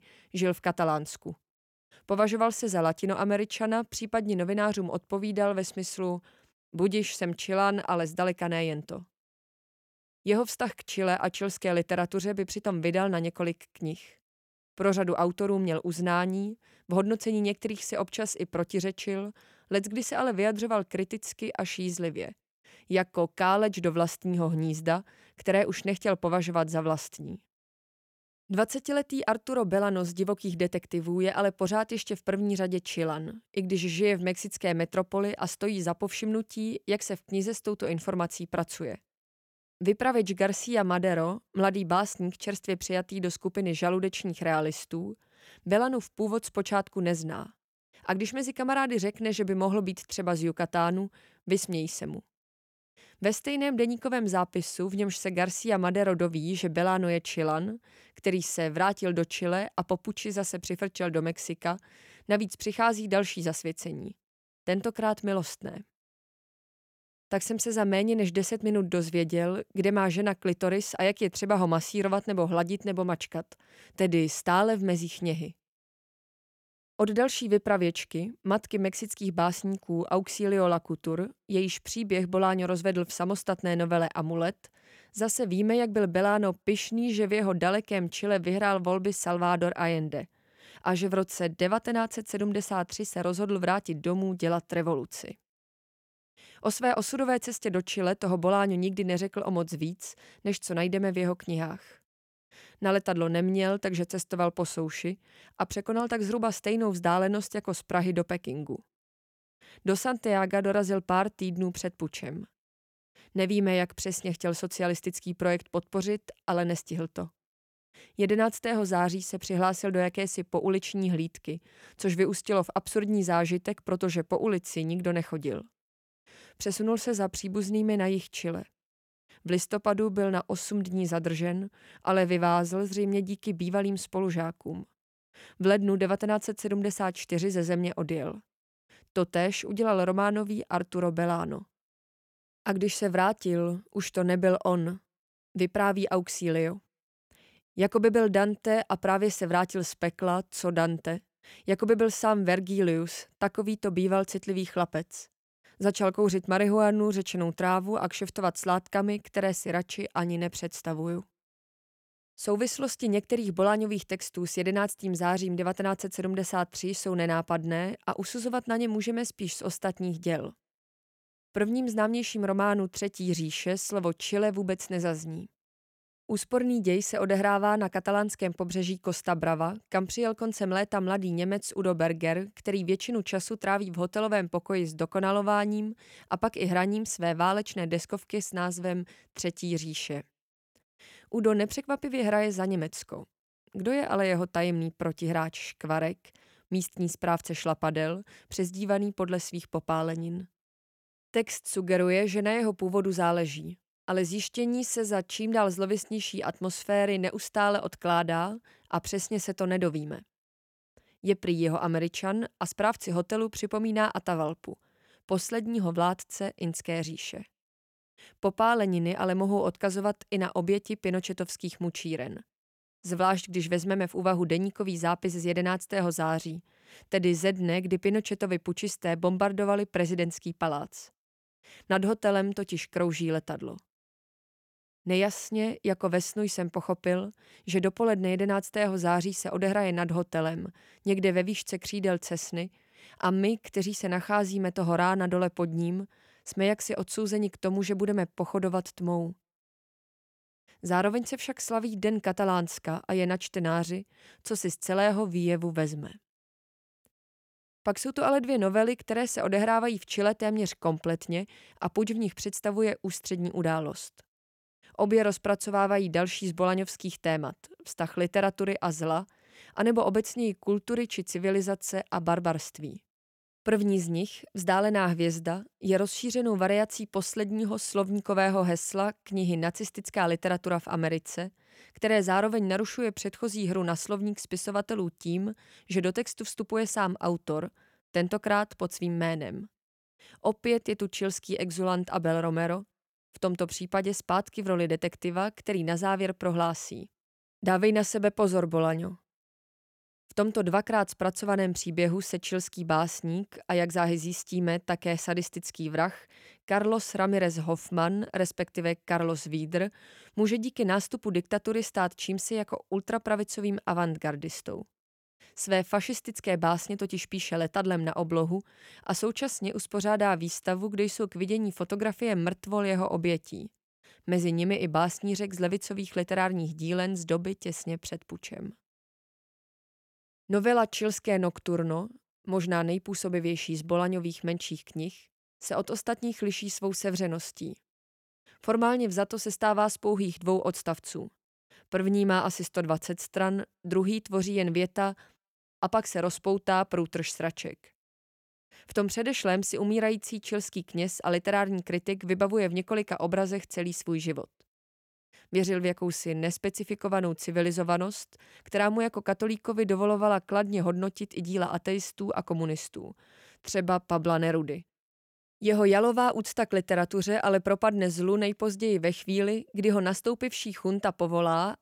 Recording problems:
none

